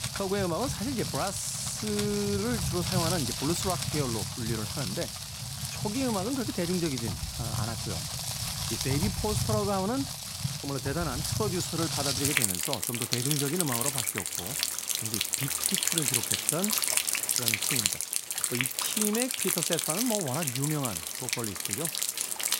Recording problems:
rain or running water; very loud; throughout; 4 dB above the speech

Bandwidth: 16 kHz